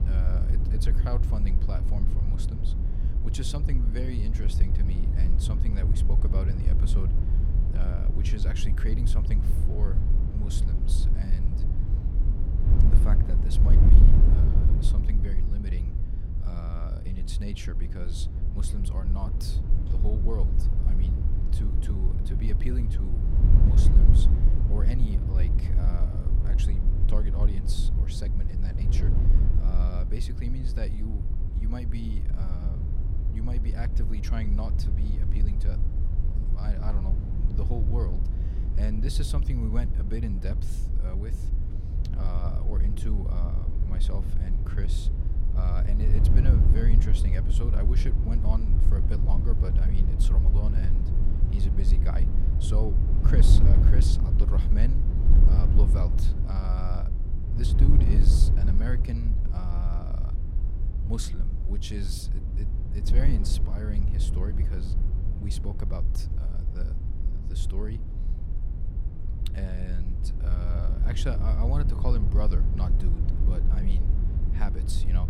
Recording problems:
wind noise on the microphone; heavy; 1 dB below the speech

